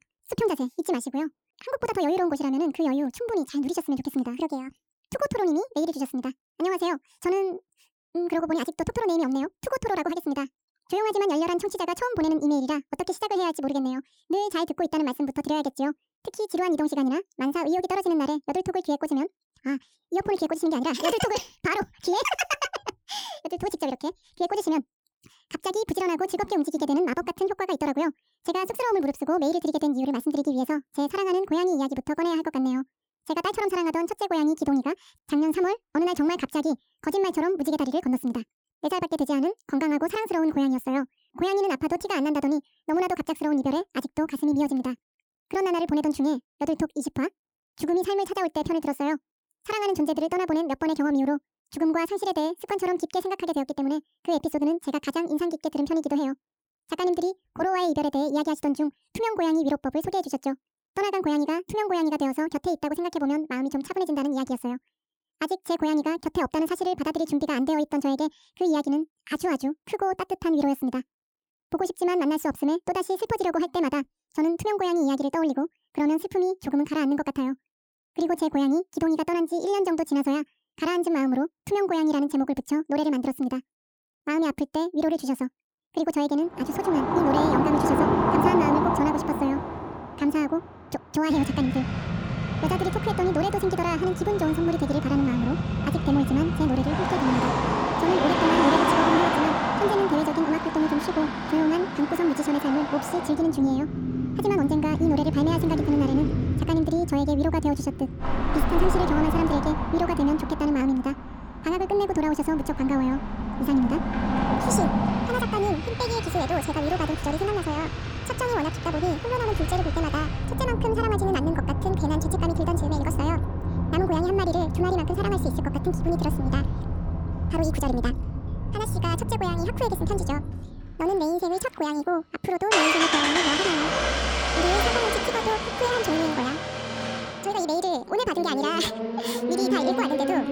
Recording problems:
wrong speed and pitch; too fast and too high; 1.7 times normal speed
traffic noise; loud; from 1:27 on; 1 dB below the speech

